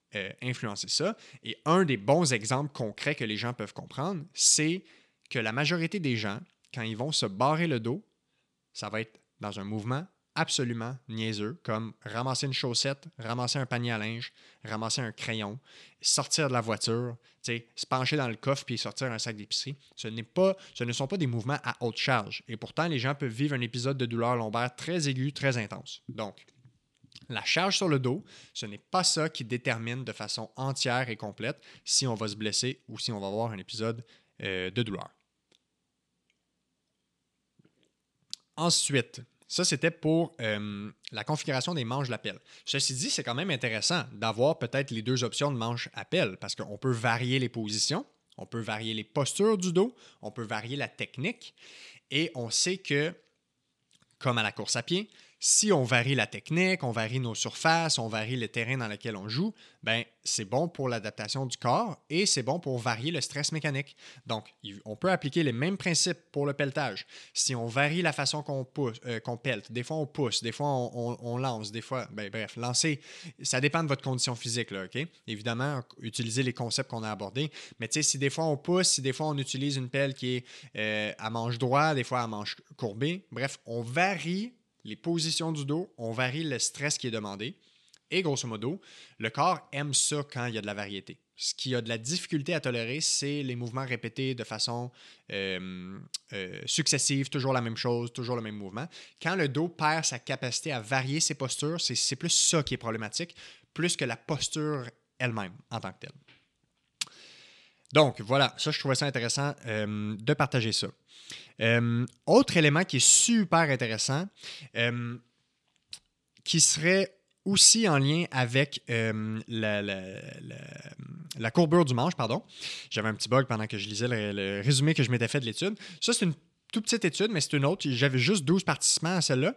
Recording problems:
none

